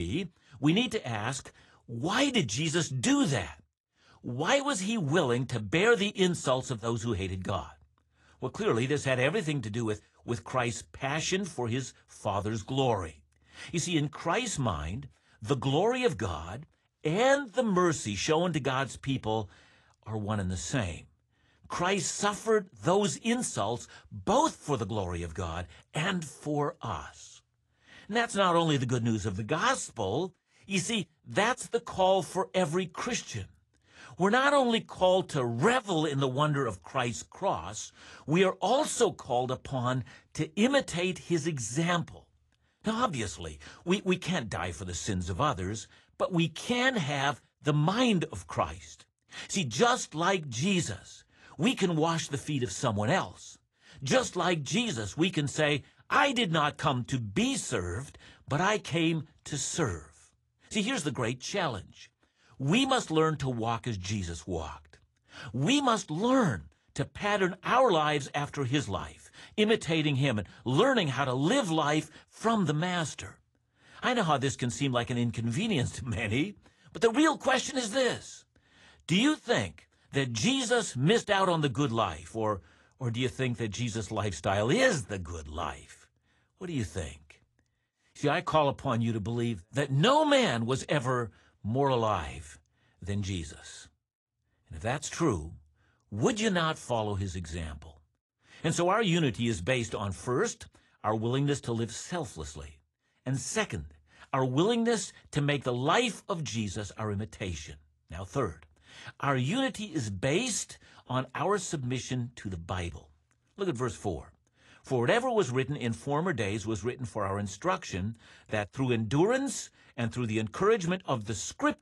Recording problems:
garbled, watery; slightly
abrupt cut into speech; at the start

